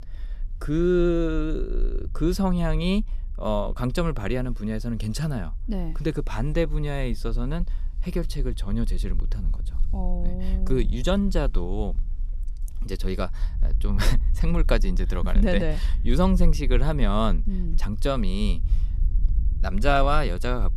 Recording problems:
low rumble; faint; throughout; 25 dB below the speech

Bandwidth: 14 kHz